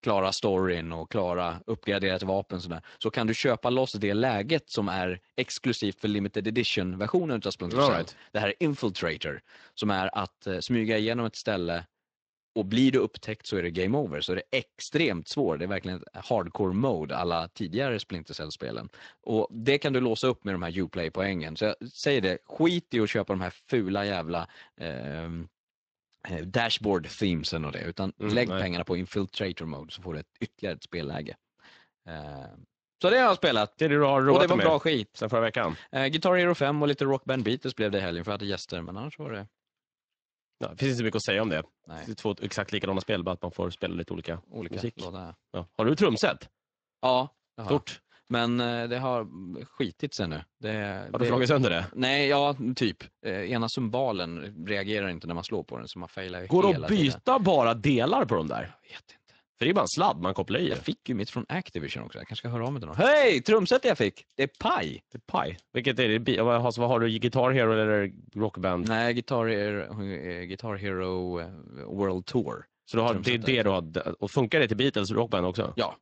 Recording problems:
garbled, watery; slightly; nothing above 8 kHz

